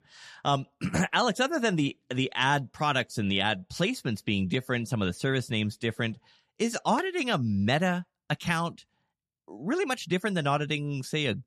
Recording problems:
none

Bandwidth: 13.5 kHz